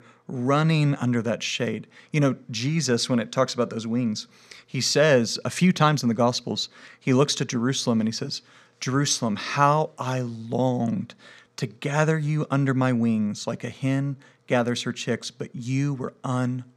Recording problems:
none

